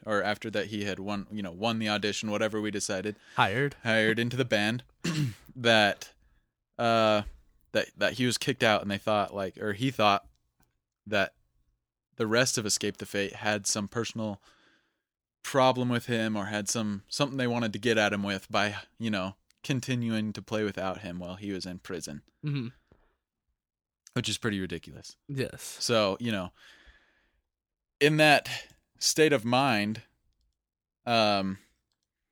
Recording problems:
none

